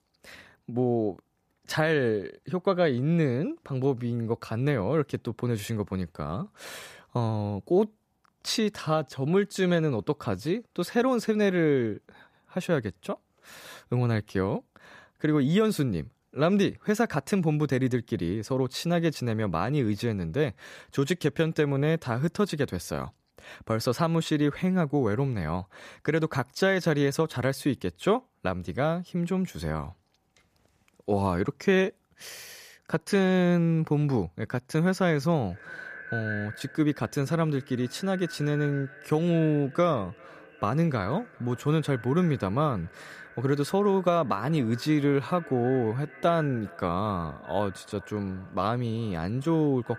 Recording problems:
echo of what is said; noticeable; from 35 s on; 400 ms later, 15 dB below the speech

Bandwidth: 14.5 kHz